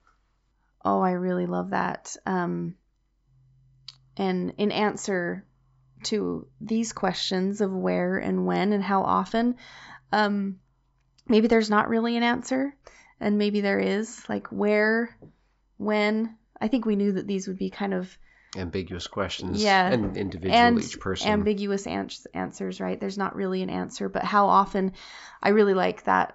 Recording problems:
high frequencies cut off; noticeable; nothing above 8 kHz

